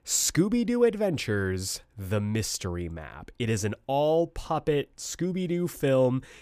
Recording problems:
none

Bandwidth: 15 kHz